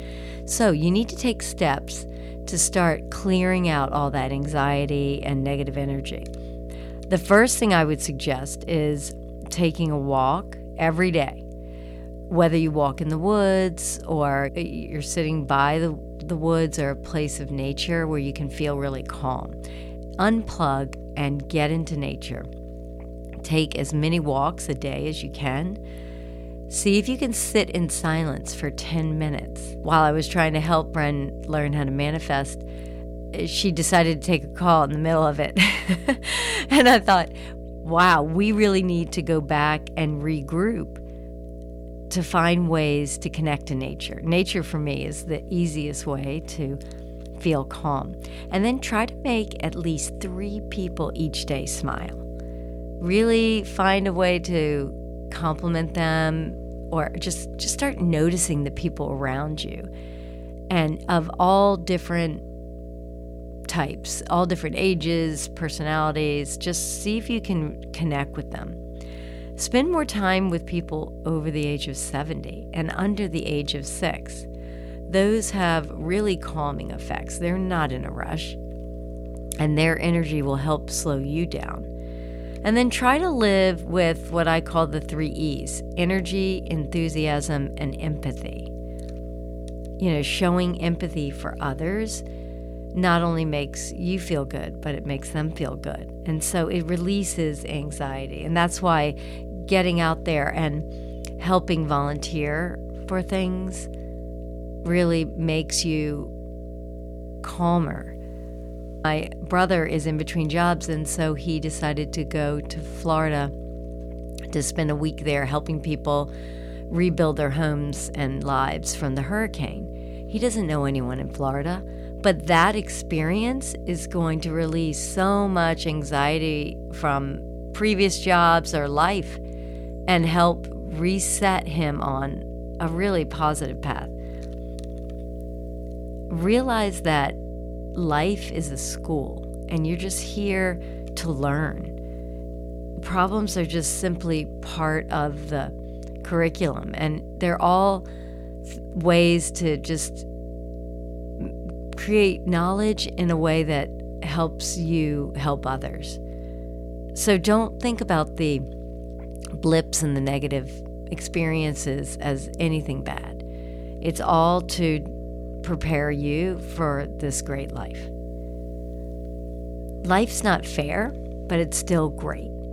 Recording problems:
electrical hum; noticeable; throughout; 60 Hz, 15 dB below the speech

